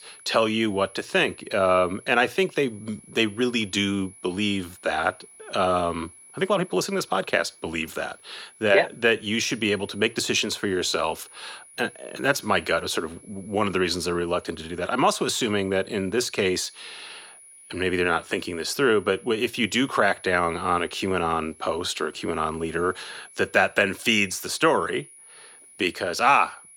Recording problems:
thin; very slightly; fading below 1 kHz
high-pitched whine; faint; throughout; 10.5 kHz, 25 dB below the speech

